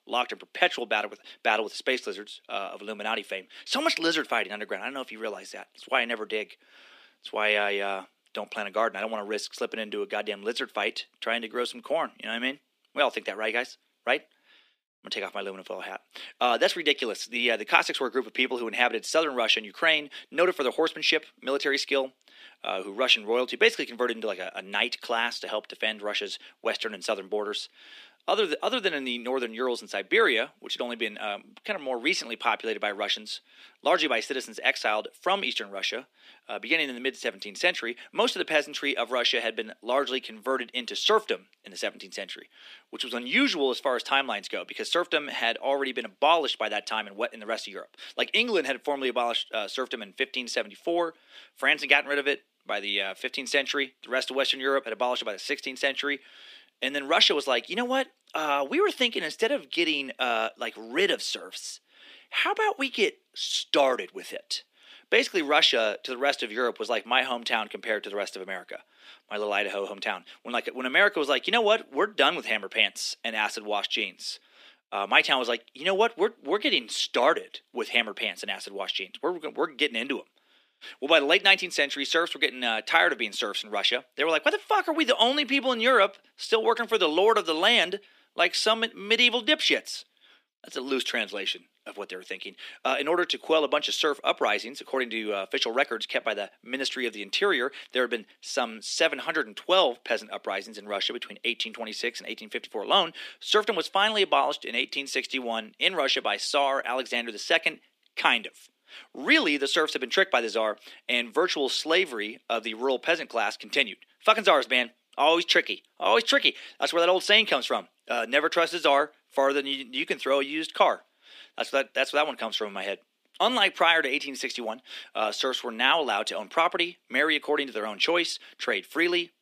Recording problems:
thin; somewhat; fading below 300 Hz

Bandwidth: 15 kHz